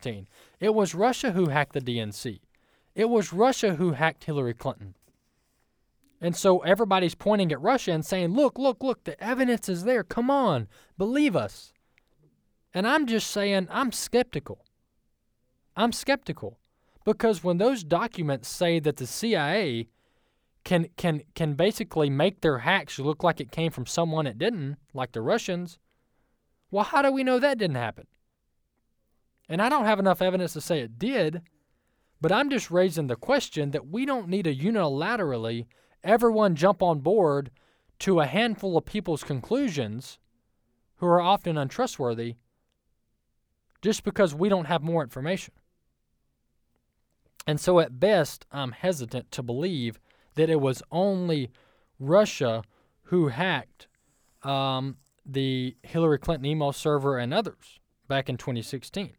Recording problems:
none

